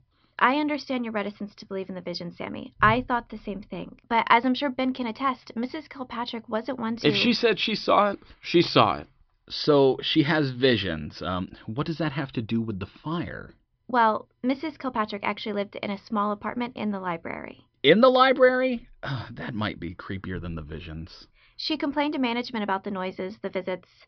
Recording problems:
high frequencies cut off; noticeable; nothing above 5.5 kHz

